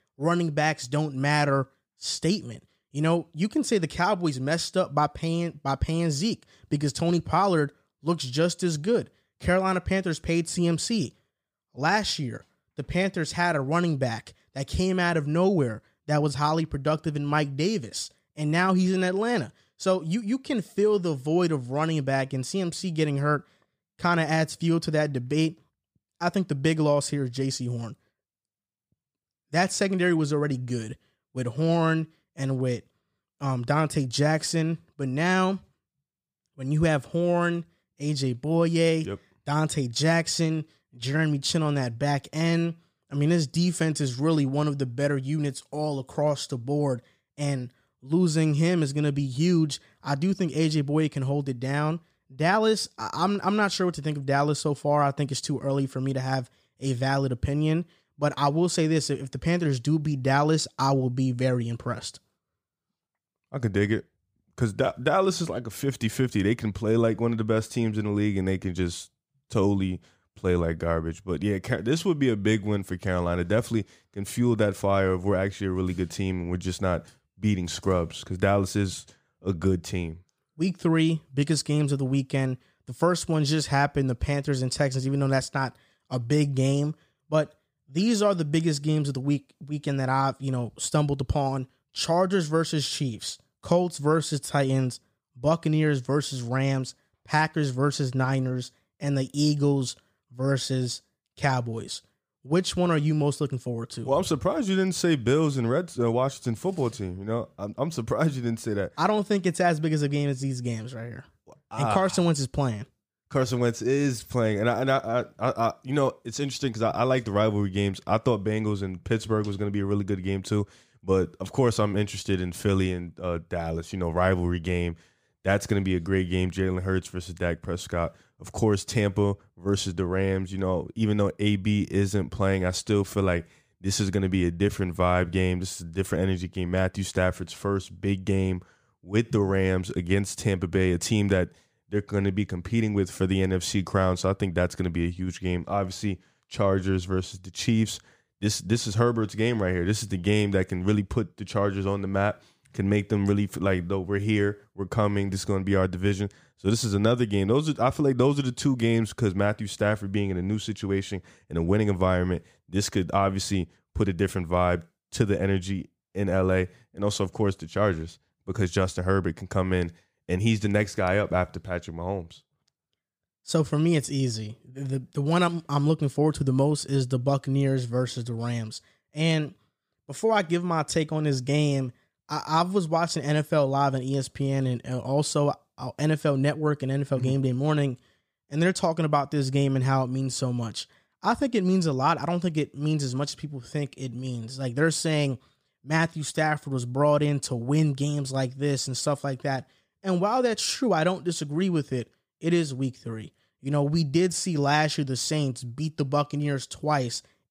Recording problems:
none

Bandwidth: 15 kHz